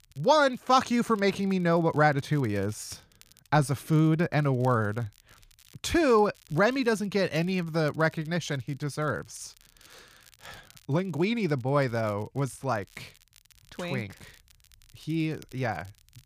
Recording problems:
crackle, like an old record; faint; 30 dB below the speech

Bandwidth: 15 kHz